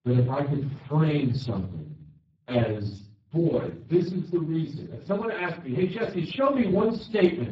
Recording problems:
off-mic speech; far
garbled, watery; badly; nothing above 7.5 kHz
room echo; slight; dies away in 0.4 s

